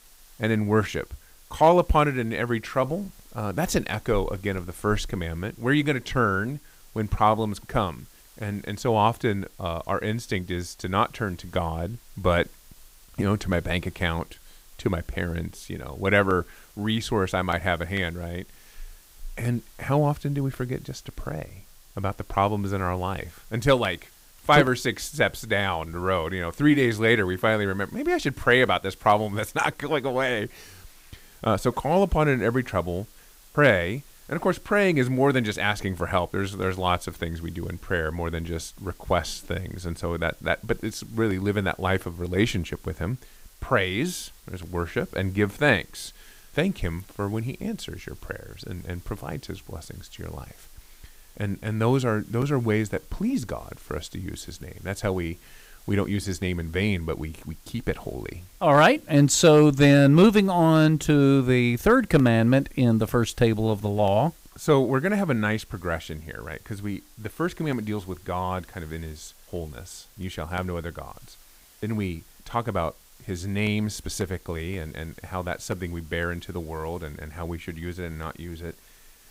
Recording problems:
hiss; faint; throughout; 25 dB below the speech

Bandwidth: 15.5 kHz